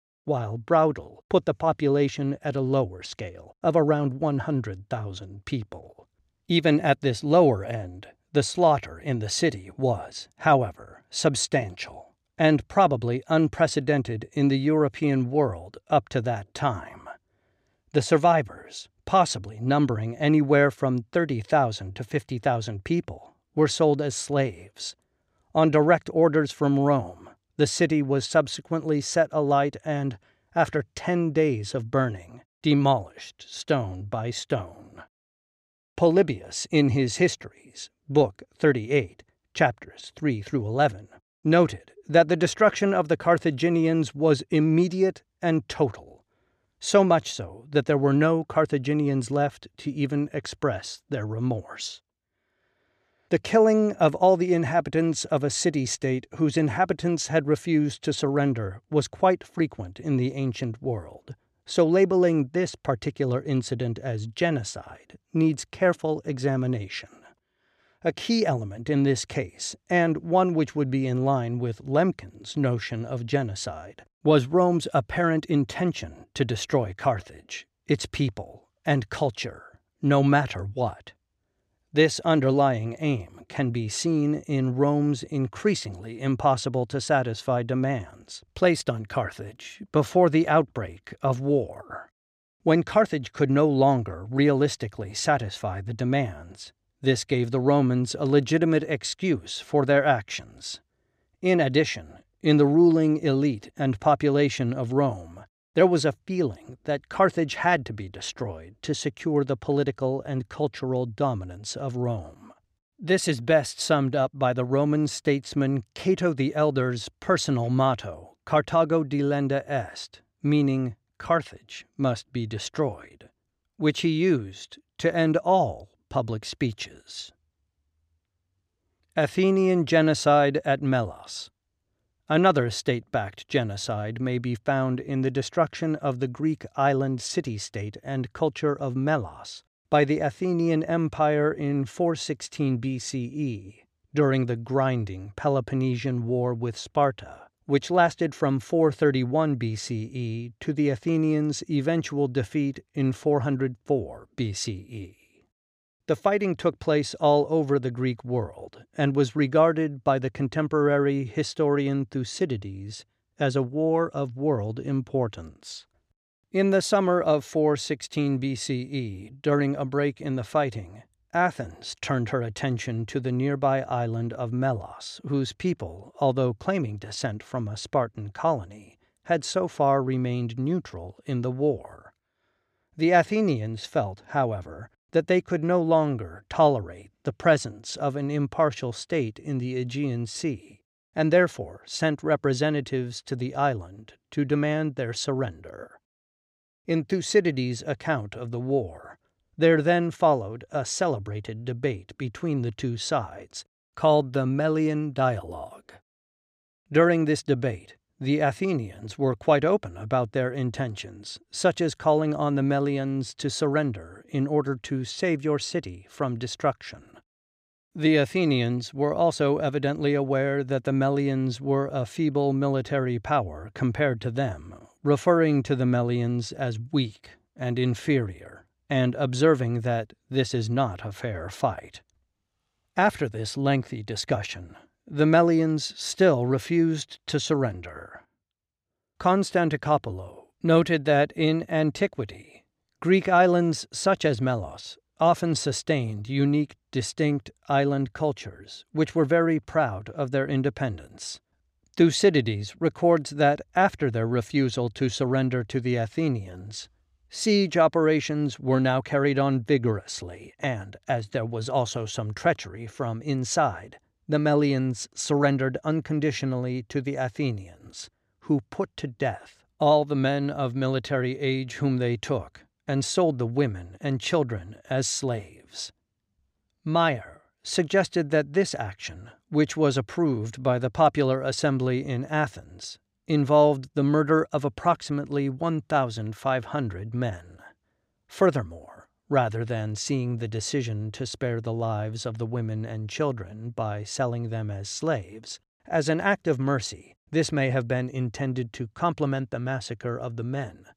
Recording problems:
none

